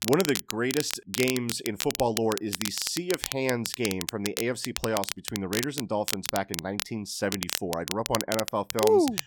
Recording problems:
crackle, like an old record; loud; 4 dB below the speech

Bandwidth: 17.5 kHz